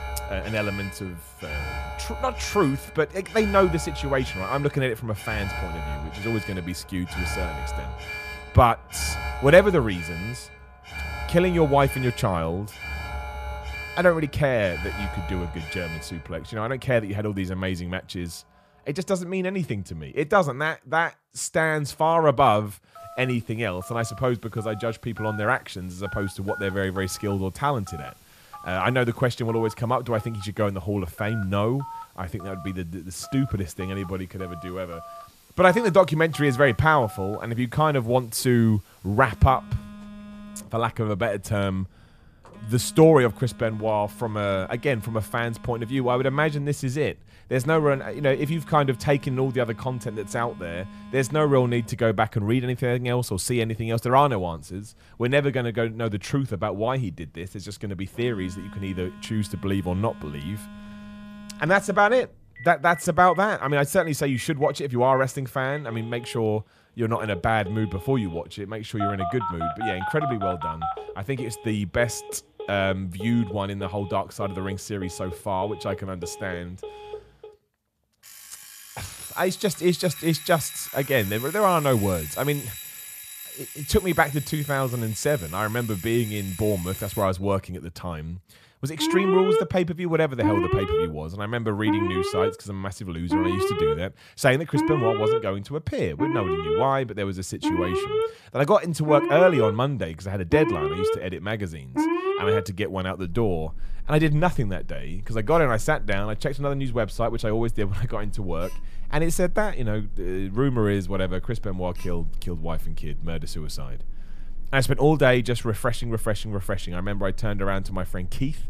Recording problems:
alarms or sirens; loud; throughout; 8 dB below the speech

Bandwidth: 14.5 kHz